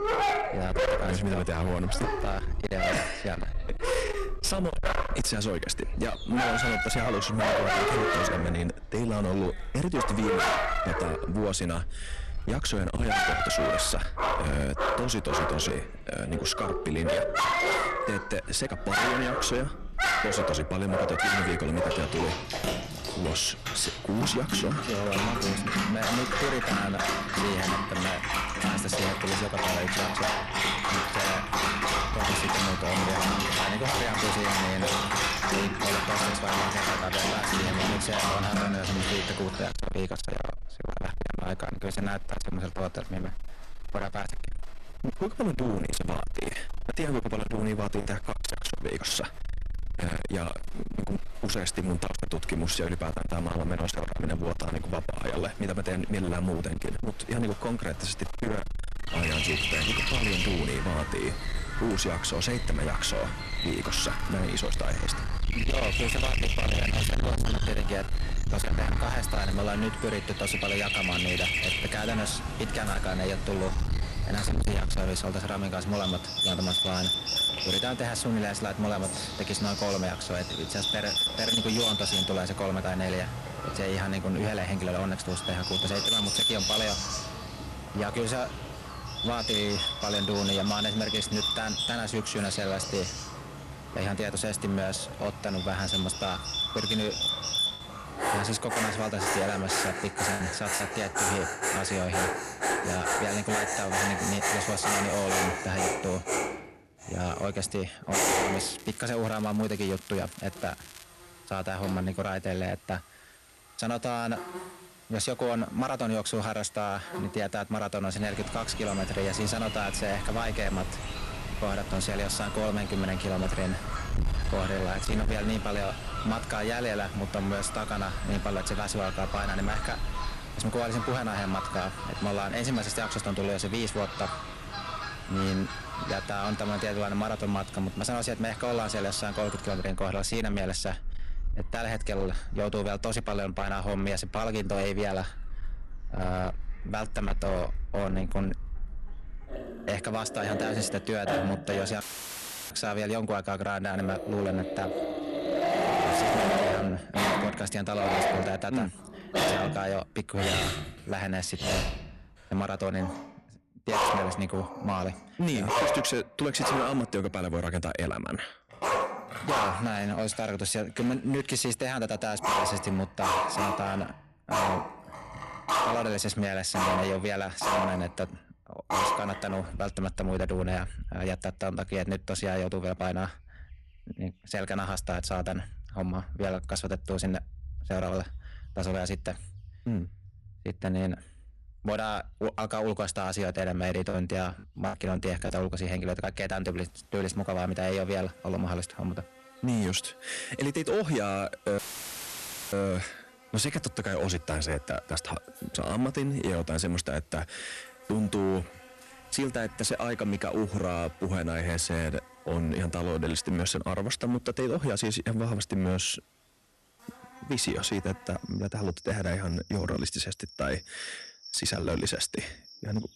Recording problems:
distortion; heavy; 15% of the sound clipped
animal sounds; very loud; throughout; 1 dB above the speech
crackling; noticeable; at 1:04, at 1:11 and from 1:48 to 1:51; 15 dB below the speech
choppy; very; at 48 s, from 1:39 to 1:41 and from 3:14 to 3:16; 5% of the speech affected
audio cutting out; filled with static; at 2:32 for 0.5 s and at 3:22 for 1 s

